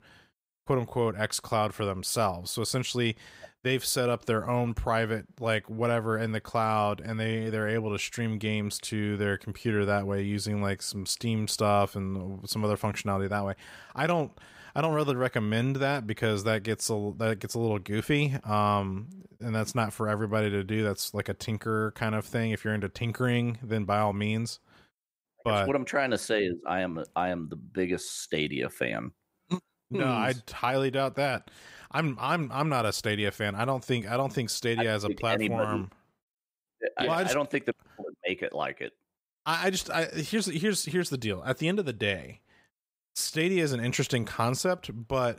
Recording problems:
none

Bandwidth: 15.5 kHz